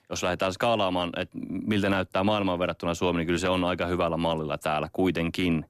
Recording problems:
none

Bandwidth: 14 kHz